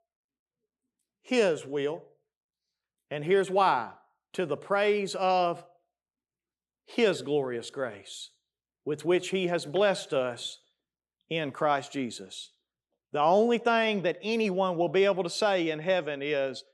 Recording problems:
none

